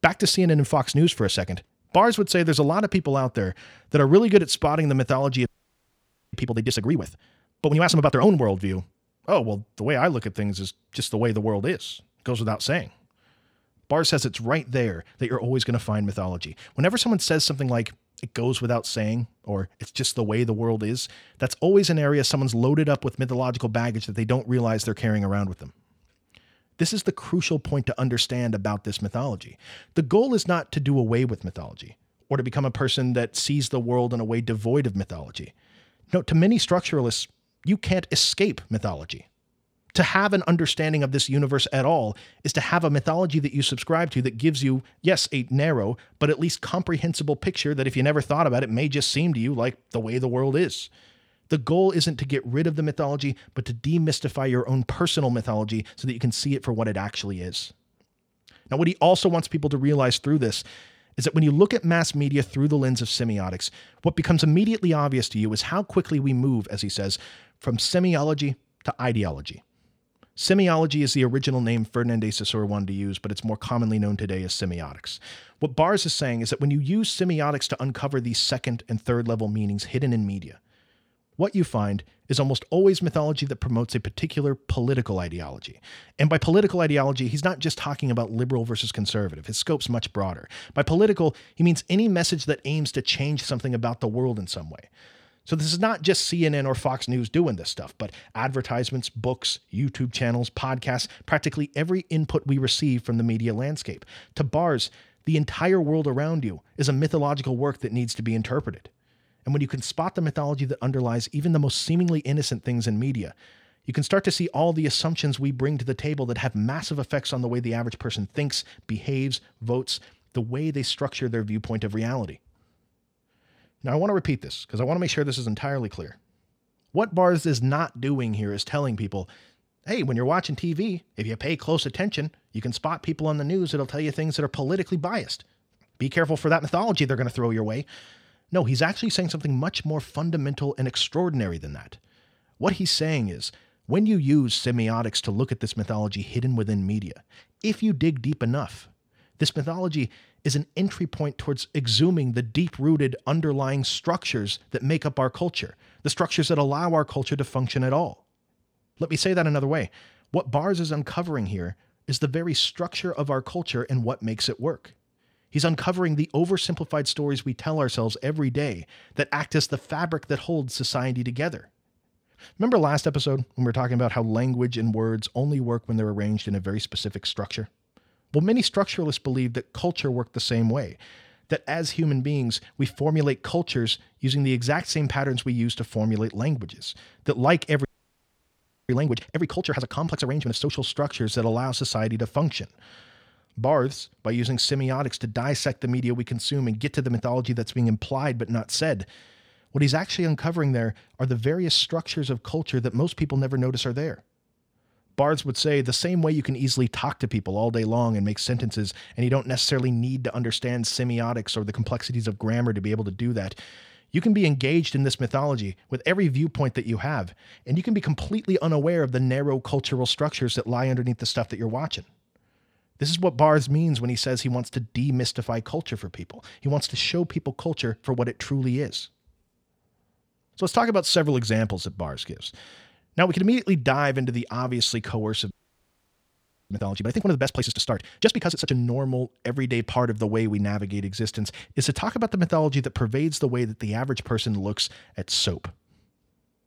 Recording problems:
audio freezing; at 5.5 s for 1 s, at 3:08 for 1 s and at 3:56 for 1 s

